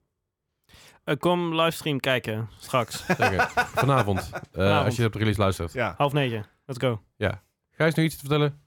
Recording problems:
none

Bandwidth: 18.5 kHz